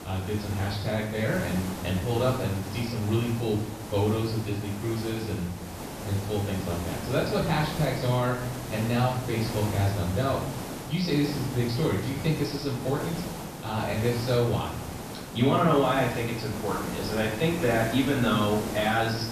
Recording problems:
off-mic speech; far
room echo; noticeable; dies away in 0.7 s
high frequencies cut off; noticeable; nothing above 5.5 kHz
hiss; loud; throughout; 9 dB below the speech

